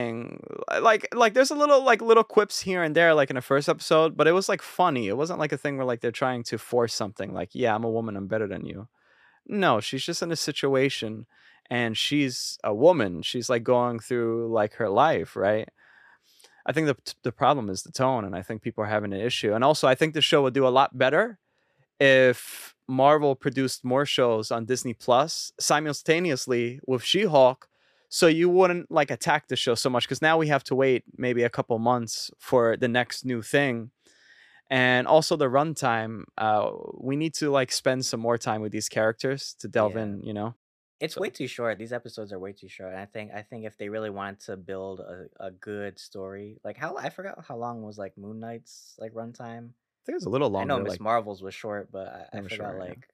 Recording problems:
abrupt cut into speech; at the start

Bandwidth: 14 kHz